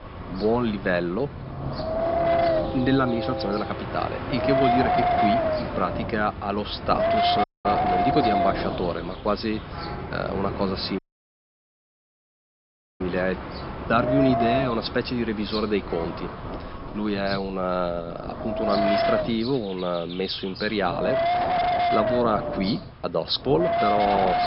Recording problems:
high frequencies cut off; noticeable; nothing above 5.5 kHz
wind noise on the microphone; heavy; 4 dB above the speech
train or aircraft noise; loud; throughout; 8 dB below the speech
animal sounds; noticeable; throughout; 20 dB below the speech
audio cutting out; at 7.5 s and at 11 s for 2 s

